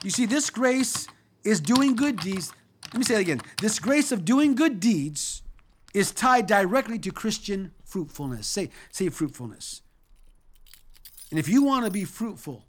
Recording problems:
household noises; noticeable; throughout; 15 dB below the speech

